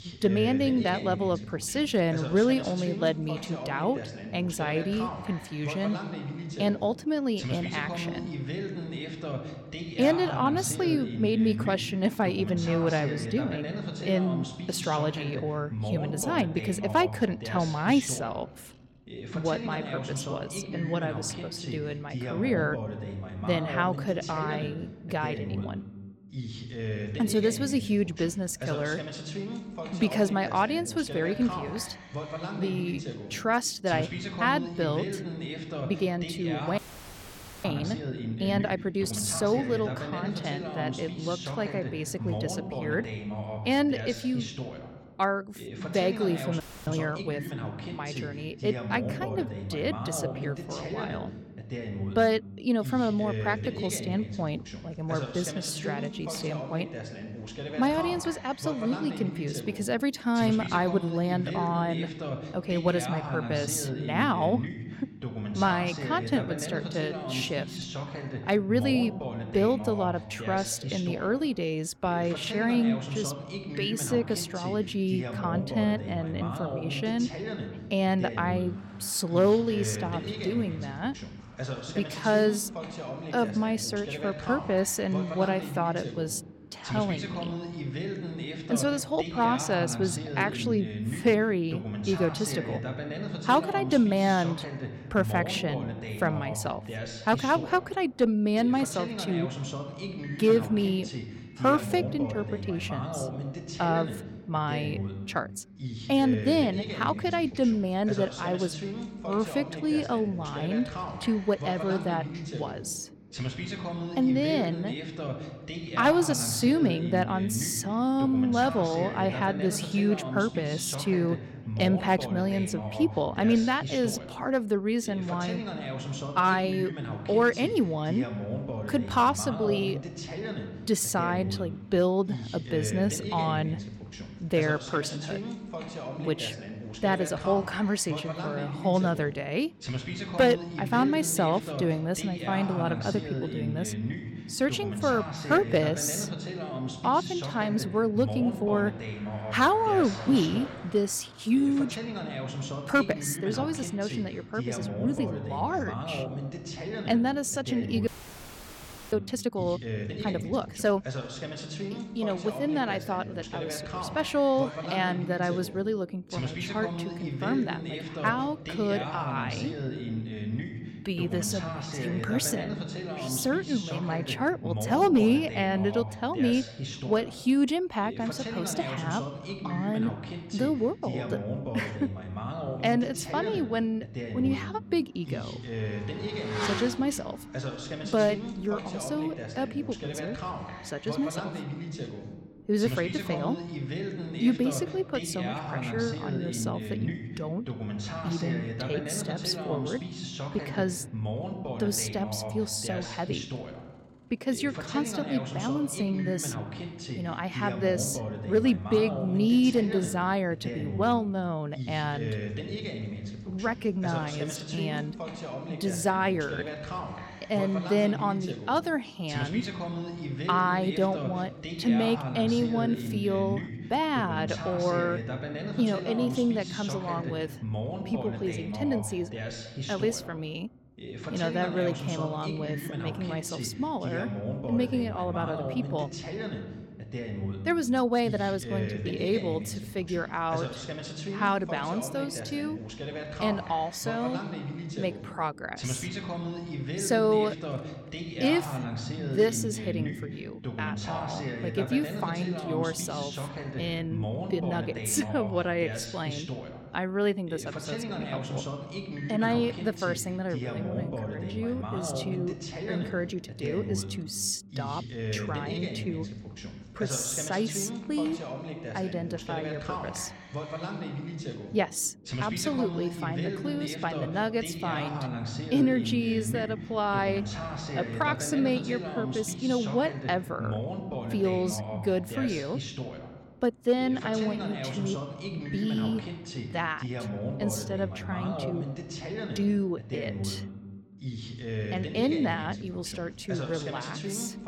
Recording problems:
voice in the background; loud; throughout; 7 dB below the speech
traffic noise; faint; throughout; 20 dB below the speech
audio freezing; at 37 s for 1 s, at 47 s and at 2:38 for 1 s

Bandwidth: 17 kHz